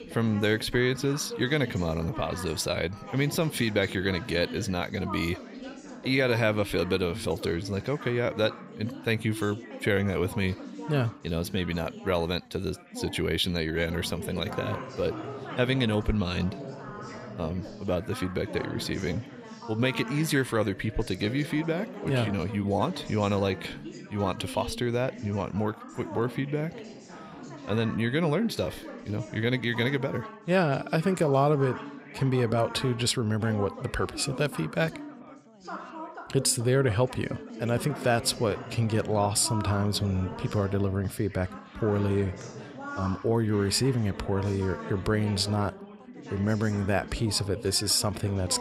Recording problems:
background chatter; noticeable; throughout; 4 voices, 15 dB below the speech

